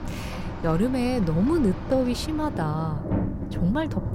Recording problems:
rain or running water; loud; throughout; 7 dB below the speech

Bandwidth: 16 kHz